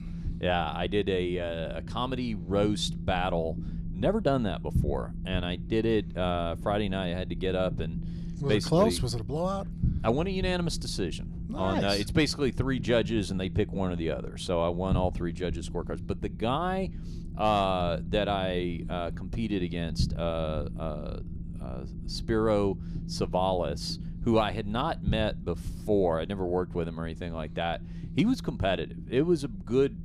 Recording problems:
low rumble; noticeable; throughout; 20 dB below the speech

